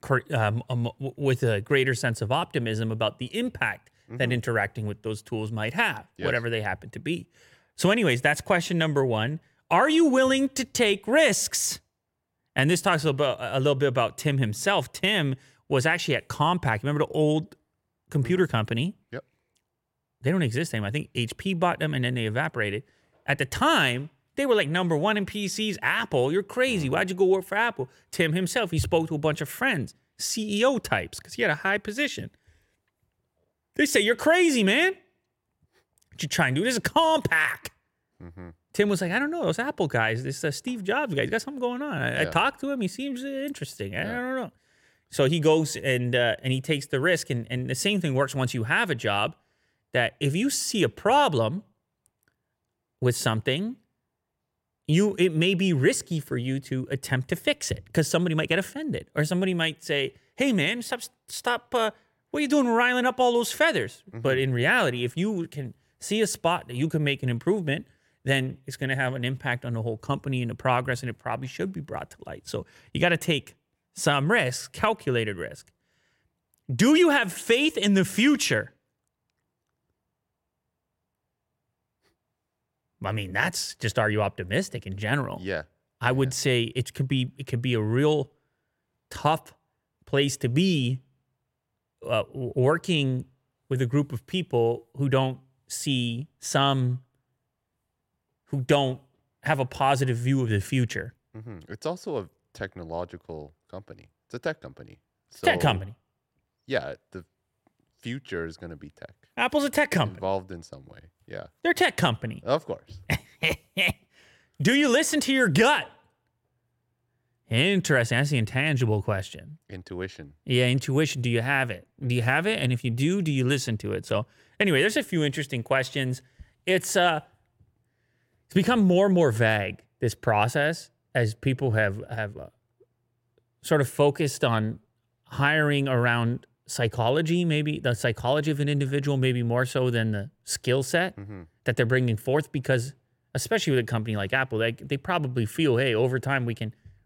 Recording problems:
none

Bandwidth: 16.5 kHz